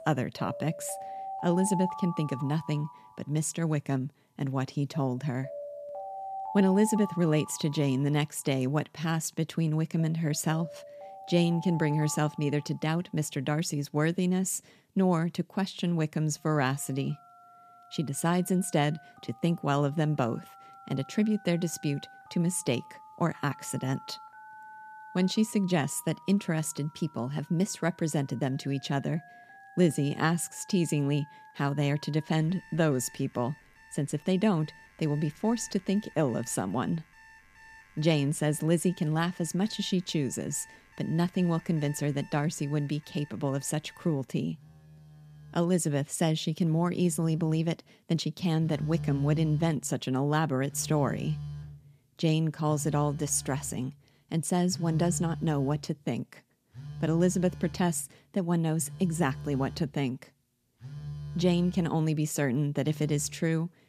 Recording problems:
alarms or sirens; noticeable; throughout; 15 dB below the speech

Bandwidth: 14.5 kHz